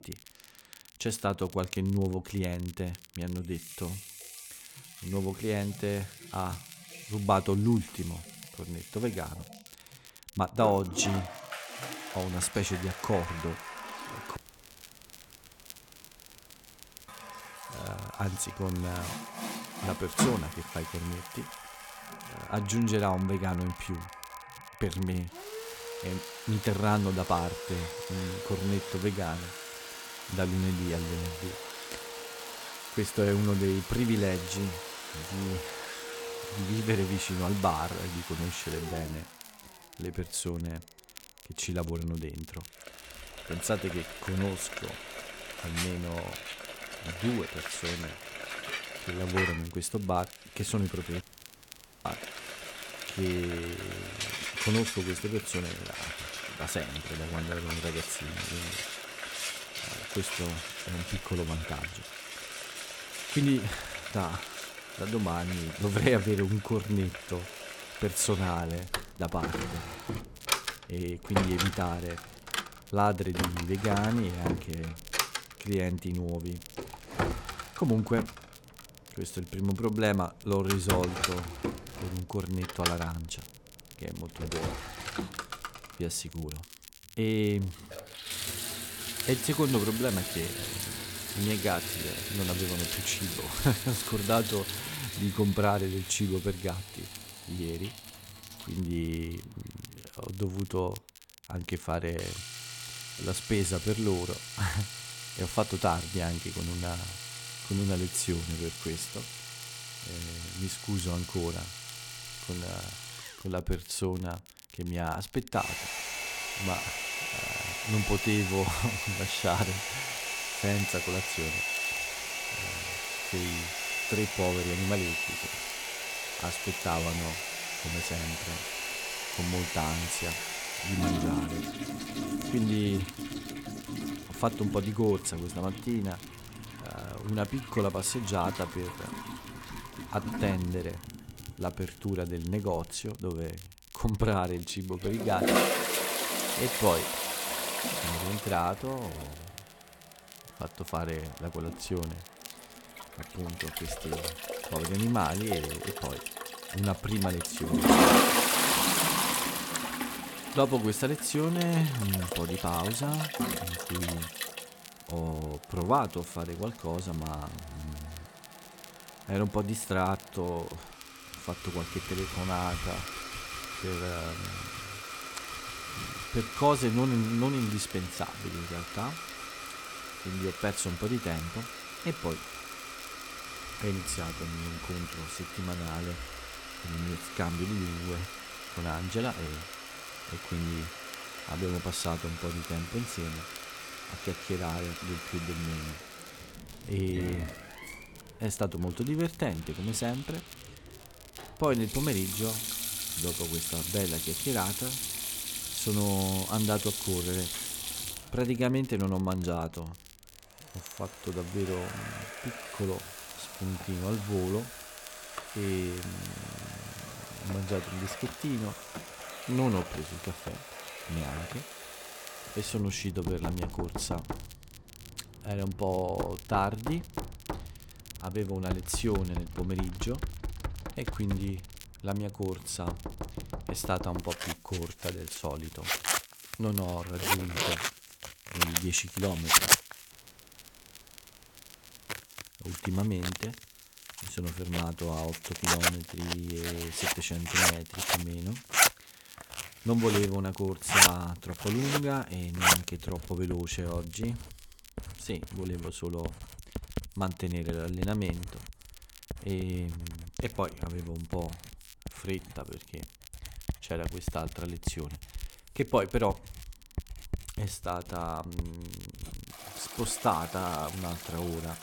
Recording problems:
household noises; loud; throughout; 1 dB below the speech
crackle, like an old record; noticeable; 20 dB below the speech
audio cutting out; at 14 s for 2.5 s, at 51 s for 1 s and at 4:00 for 2 s

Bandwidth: 17.5 kHz